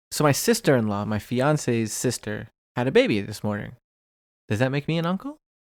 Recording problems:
none

